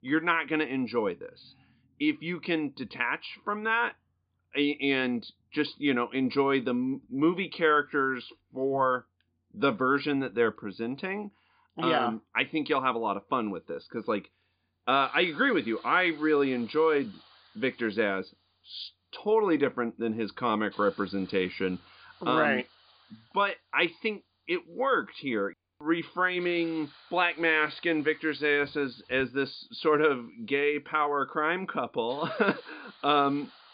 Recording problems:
high frequencies cut off; severe; nothing above 5 kHz
hiss; faint; from 14 s on; 25 dB below the speech

